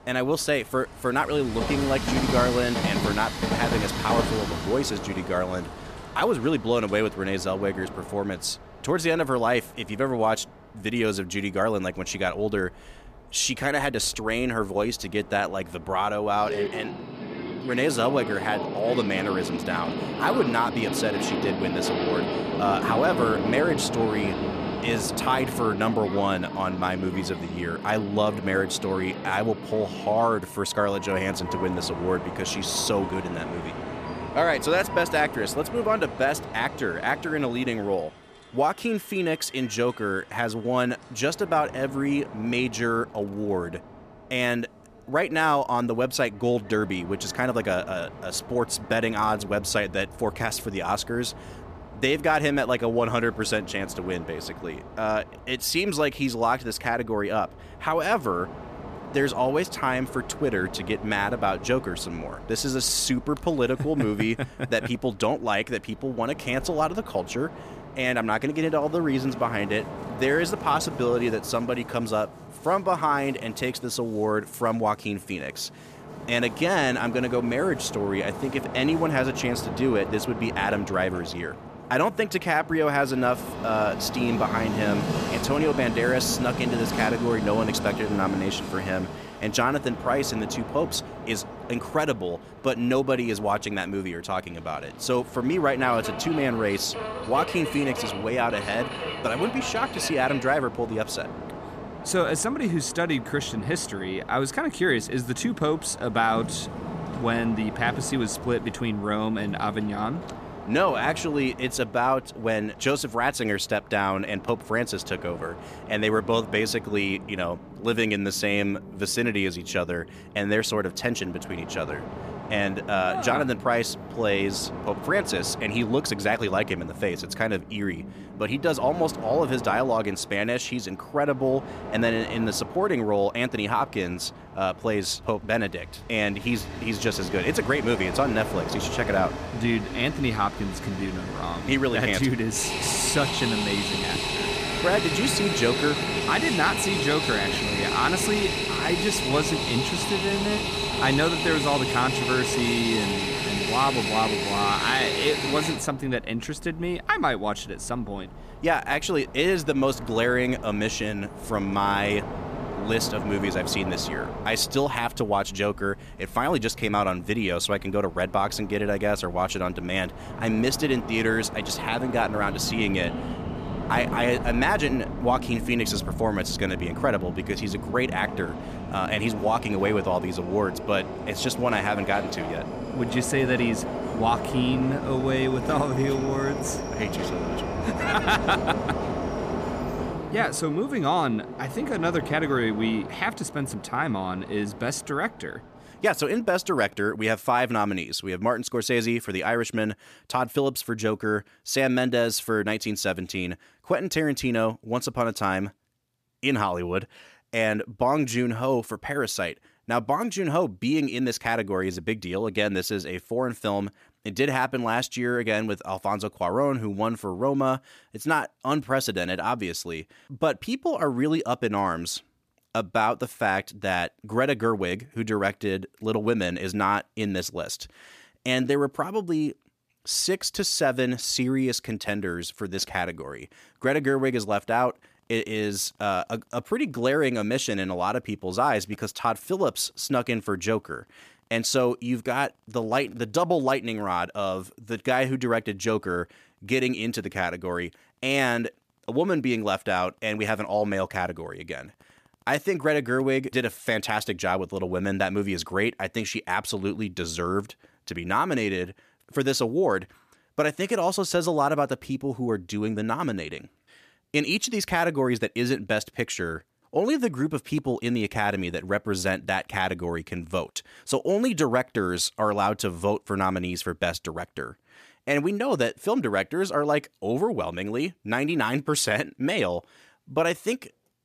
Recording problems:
train or aircraft noise; loud; until 3:17; 6 dB below the speech

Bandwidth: 14.5 kHz